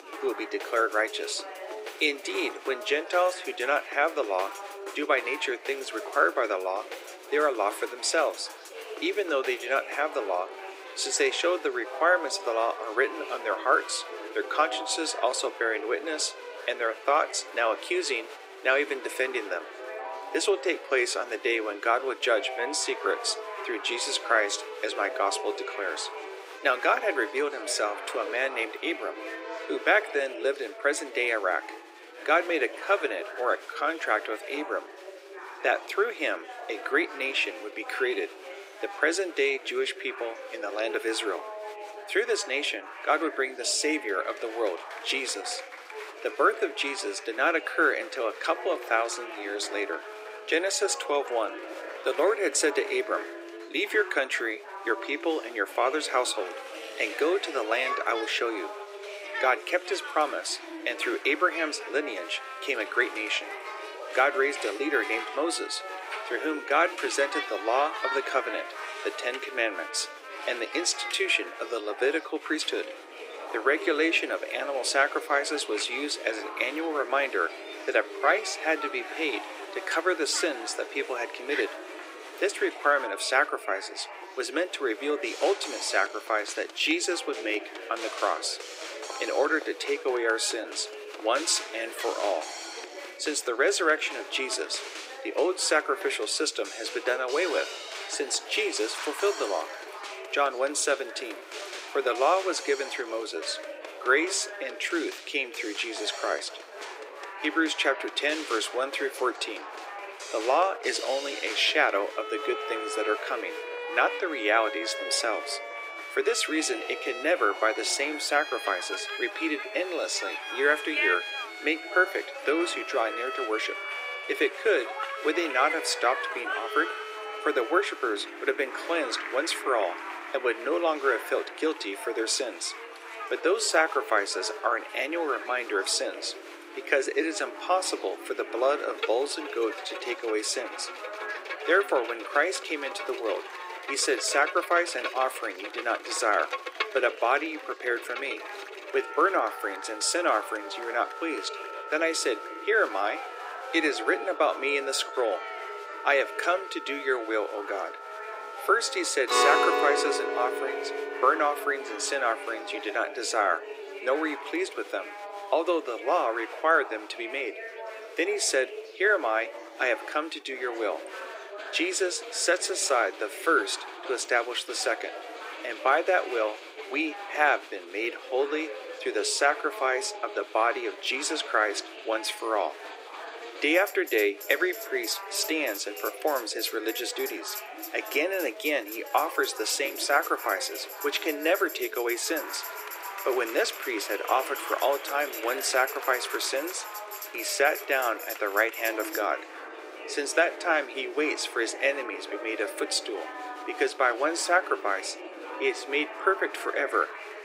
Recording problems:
thin; very; fading below 300 Hz
background music; noticeable; throughout; 10 dB below the speech
chatter from many people; noticeable; throughout; 10 dB below the speech

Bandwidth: 15.5 kHz